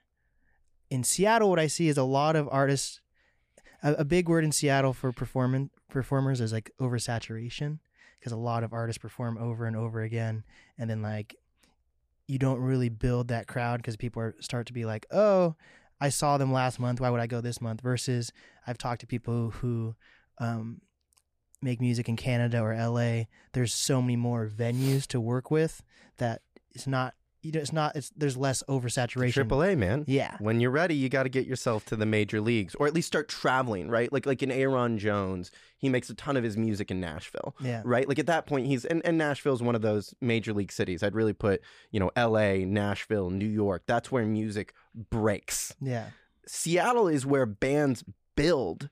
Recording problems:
none

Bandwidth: 15 kHz